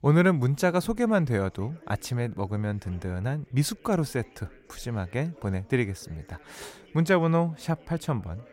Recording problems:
background chatter; faint; throughout; 3 voices, 25 dB below the speech

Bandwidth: 16 kHz